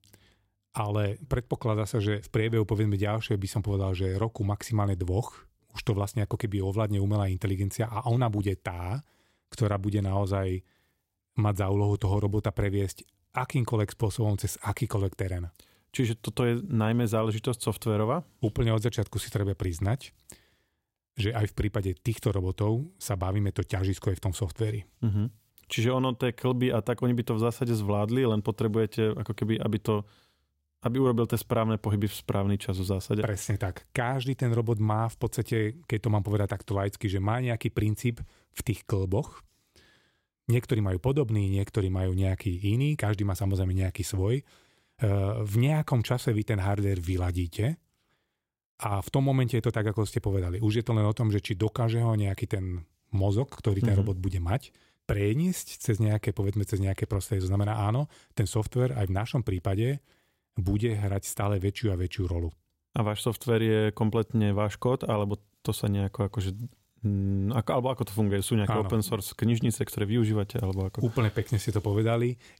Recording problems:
none

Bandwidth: 16 kHz